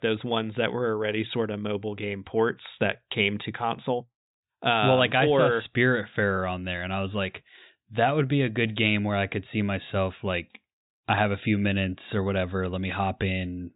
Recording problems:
high frequencies cut off; severe; nothing above 4 kHz

